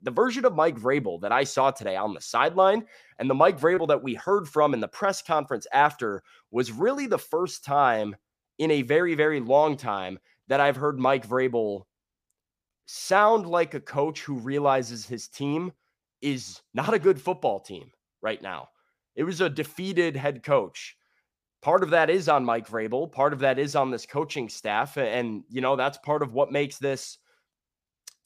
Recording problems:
none

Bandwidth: 15 kHz